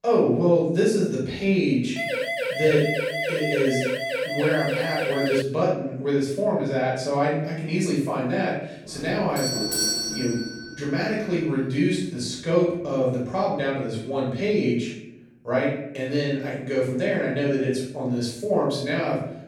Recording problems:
off-mic speech; far
room echo; noticeable; dies away in 0.7 s
siren; noticeable; from 2 to 5.5 s; peak 1 dB below the speech
doorbell; loud; from 9.5 to 11 s; peak 3 dB above the speech

